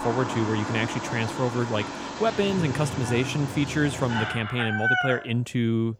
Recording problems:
animal sounds; loud; throughout; 3 dB below the speech

